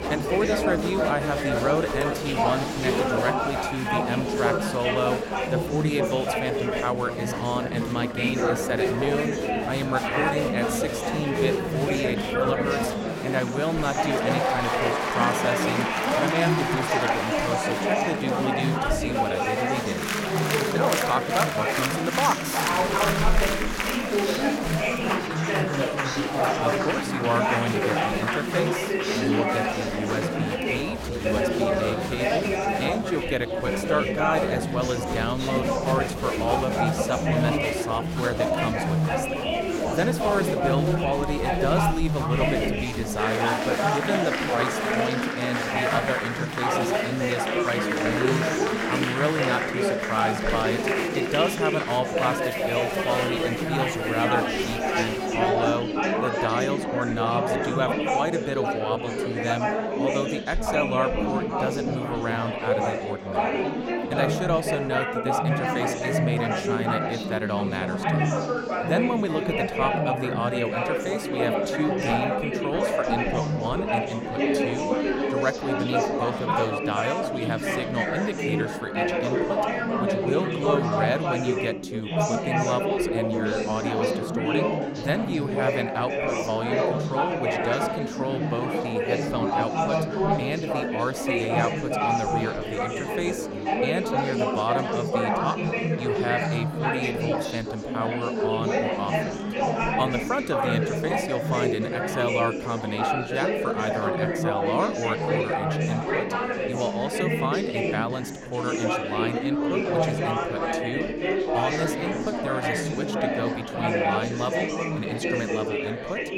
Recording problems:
murmuring crowd; very loud; throughout; 4 dB above the speech

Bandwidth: 16.5 kHz